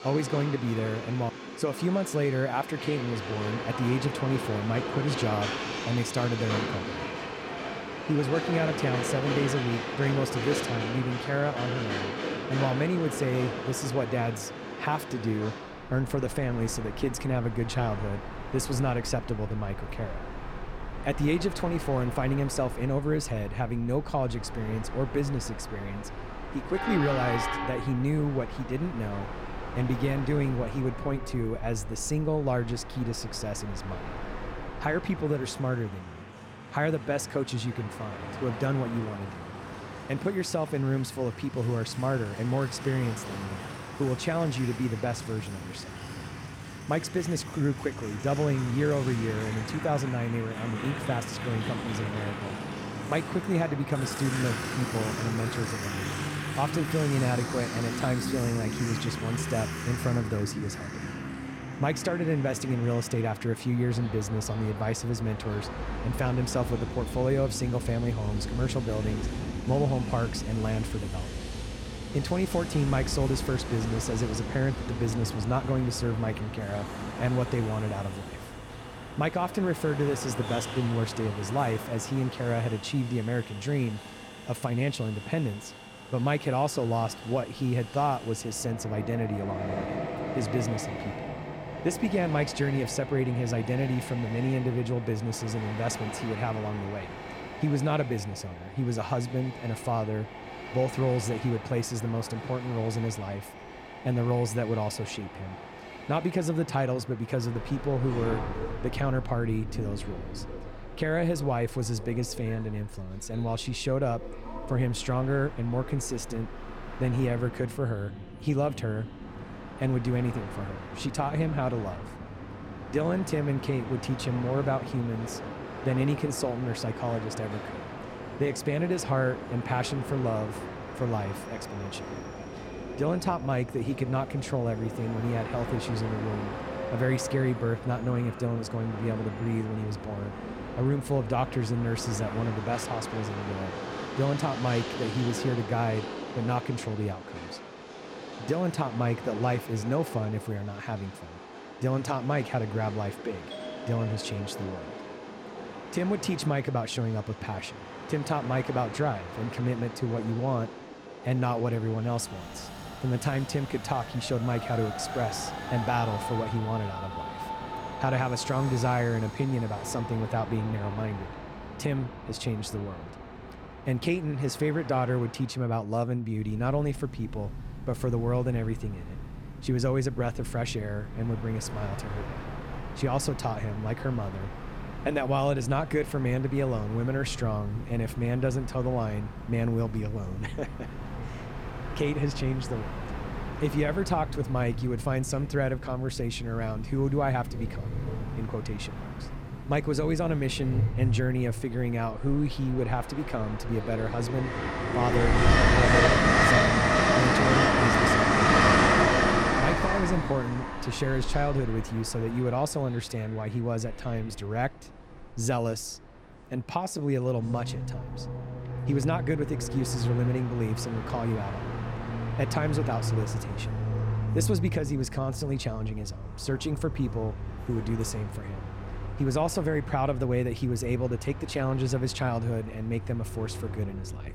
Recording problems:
train or aircraft noise; loud; throughout; 4 dB below the speech
doorbell; faint; from 2:34 to 2:35; peak 10 dB below the speech

